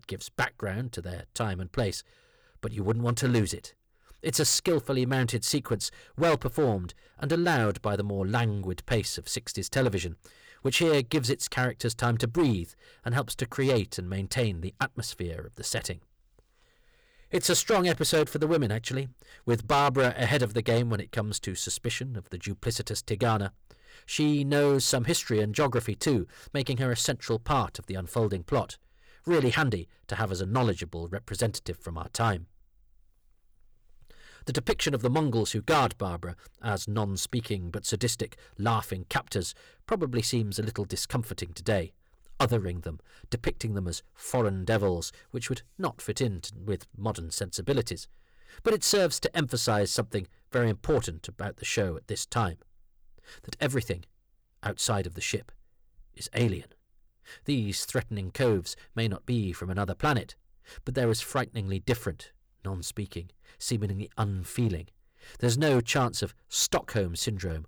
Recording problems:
distortion; slight; 4% of the sound clipped

